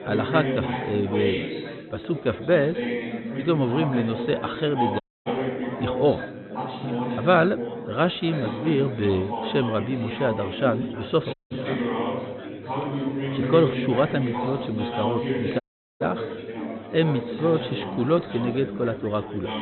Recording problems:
high frequencies cut off; severe; nothing above 4 kHz
chatter from many people; loud; throughout; 5 dB below the speech
audio cutting out; at 5 s, at 11 s and at 16 s

